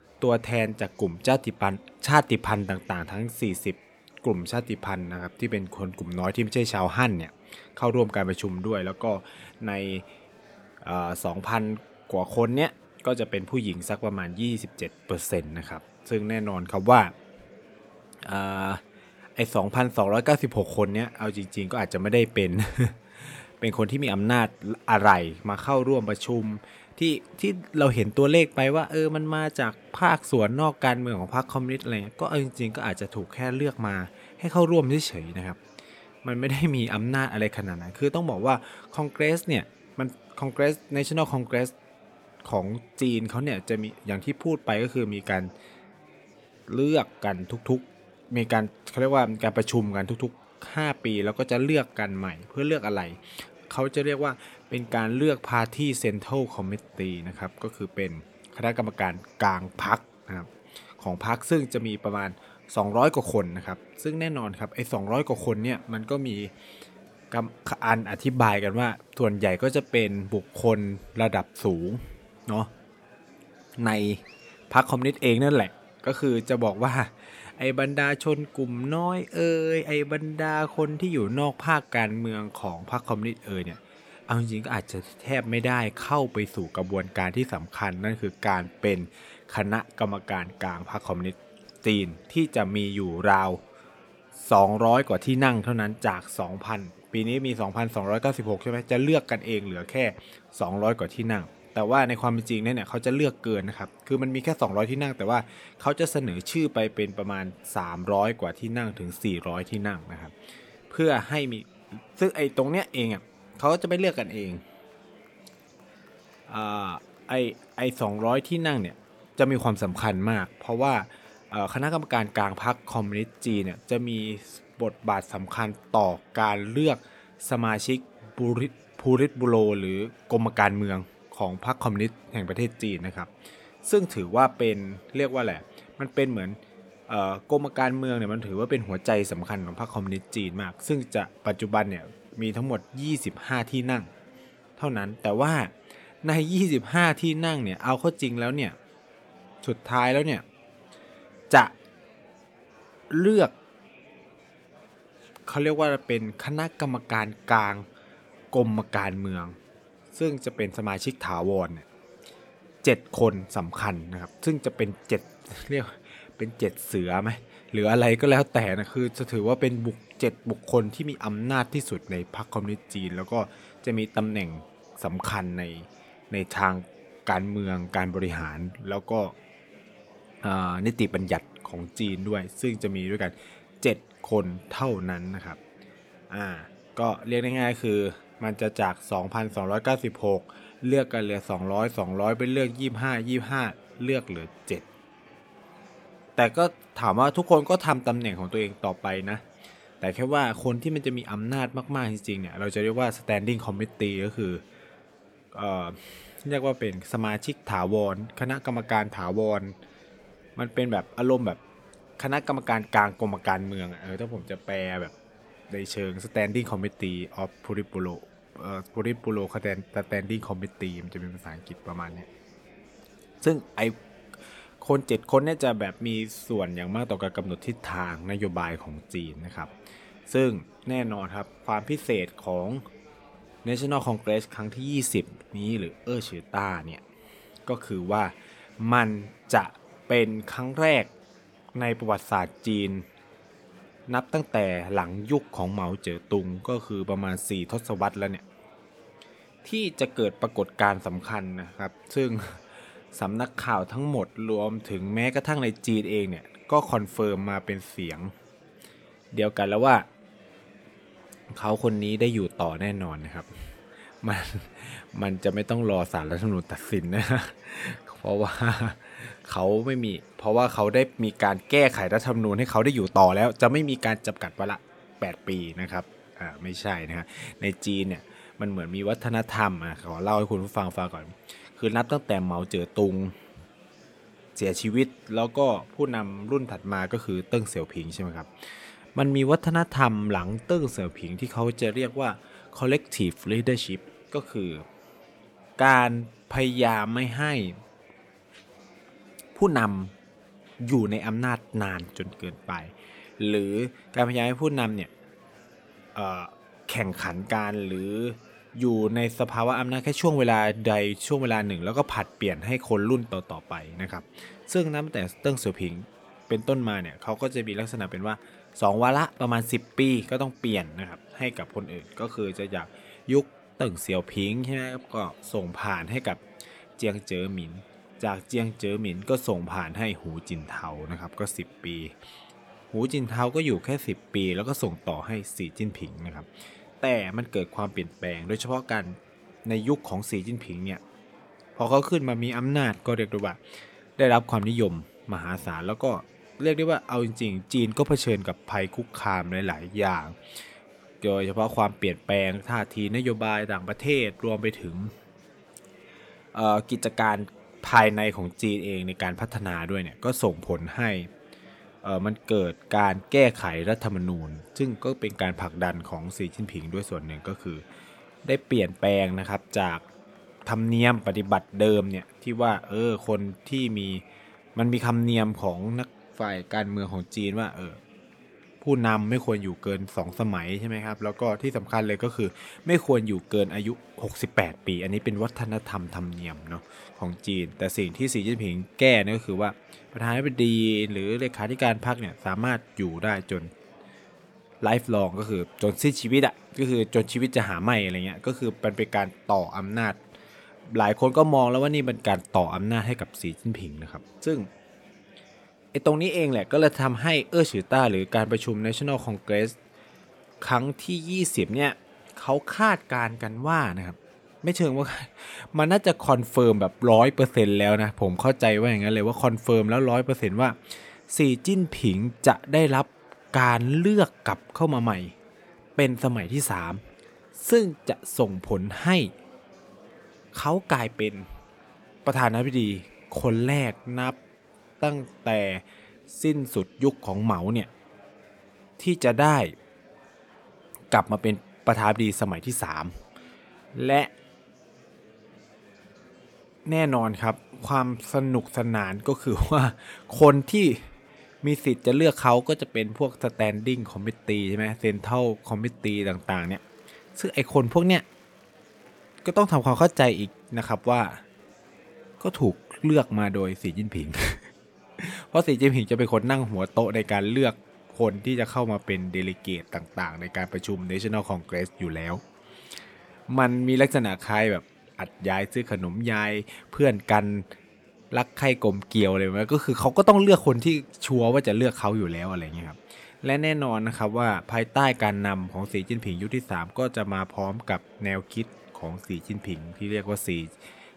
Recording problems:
murmuring crowd; faint; throughout; 25 dB below the speech

